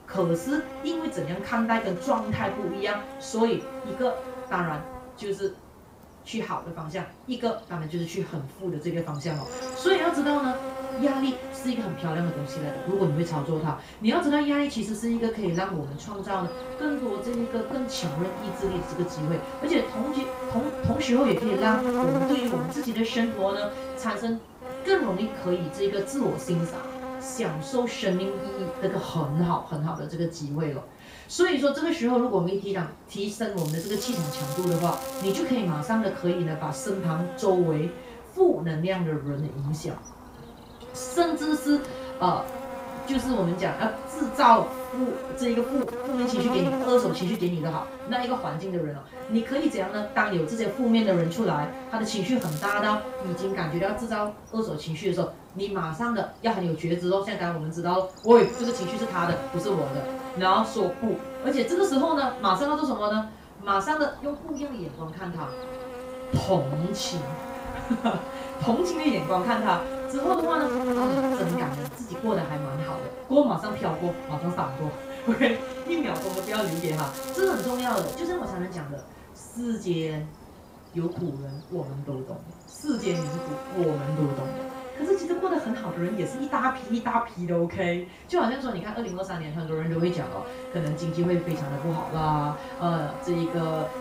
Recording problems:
off-mic speech; far
room echo; slight; dies away in 0.3 s
electrical hum; loud; throughout; 50 Hz, 7 dB below the speech
crackling; noticeable; from 34 to 35 s, at 52 s and from 1:16 to 1:18; 15 dB below the speech

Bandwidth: 15.5 kHz